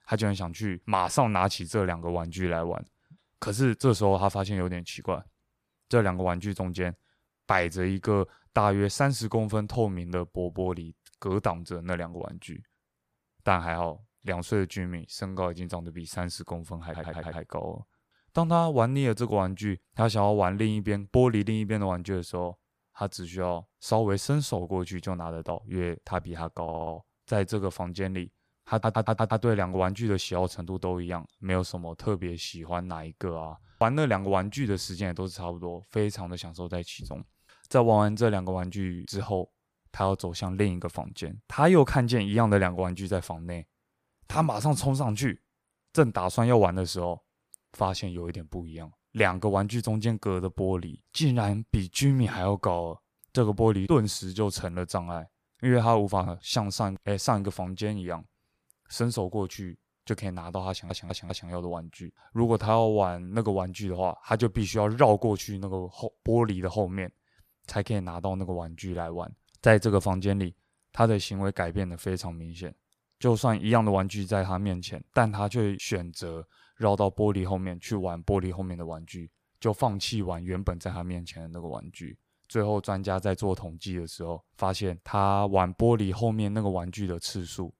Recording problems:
audio stuttering; 4 times, first at 17 s

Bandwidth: 15 kHz